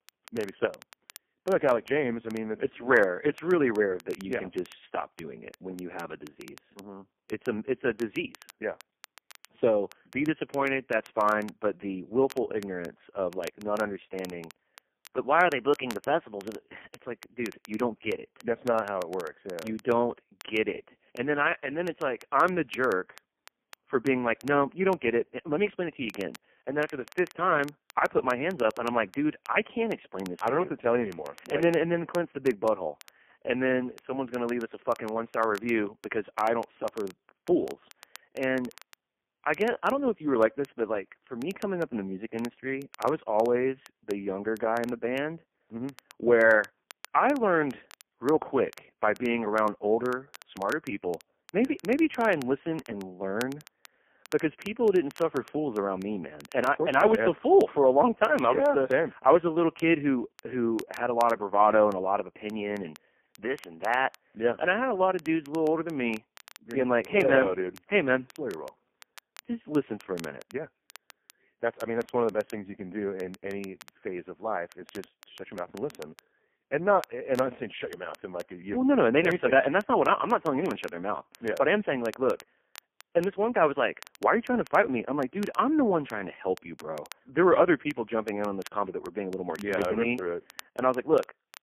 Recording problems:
phone-call audio; poor line; nothing above 3 kHz
crackle, like an old record; faint; 25 dB below the speech

